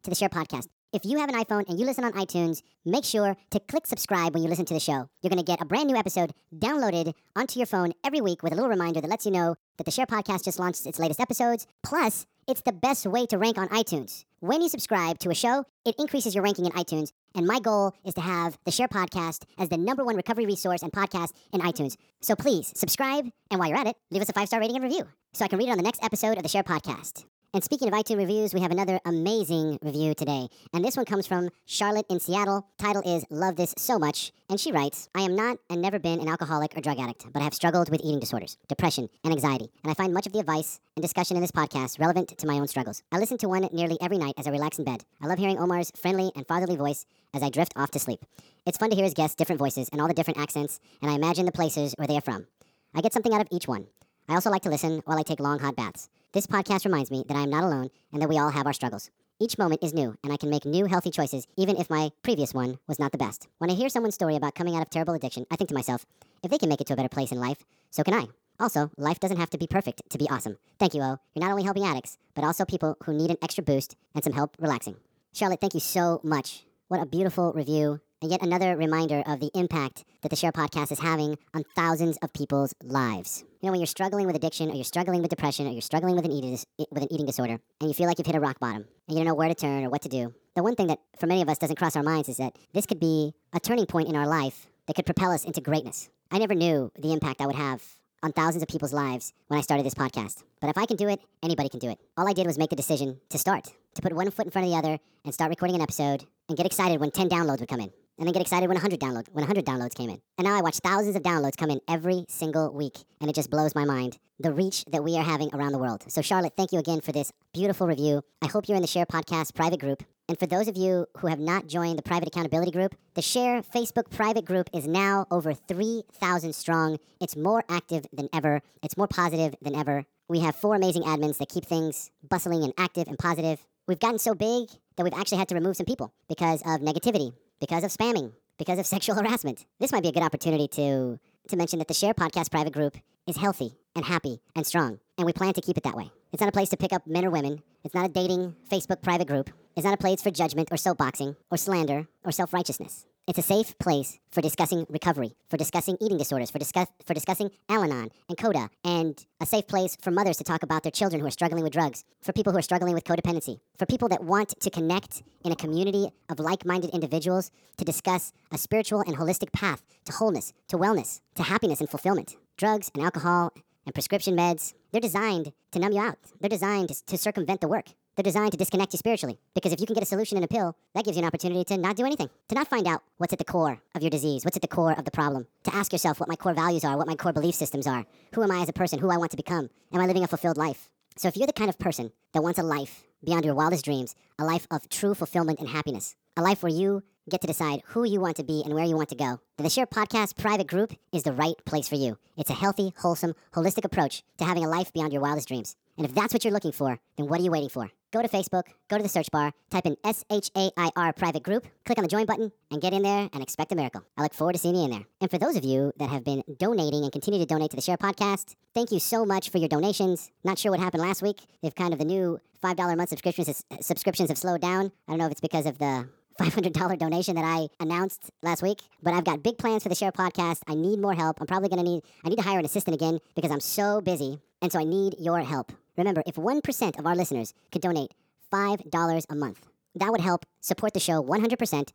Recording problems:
wrong speed and pitch; too fast and too high; 1.5 times normal speed

